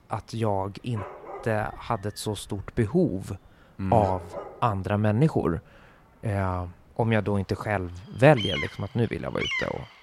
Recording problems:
animal sounds; loud; throughout; 8 dB below the speech

